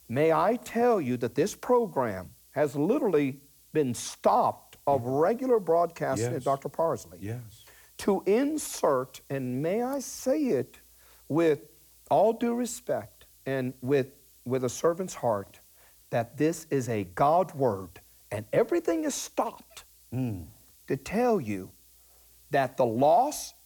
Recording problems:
hiss; faint; throughout; 25 dB below the speech

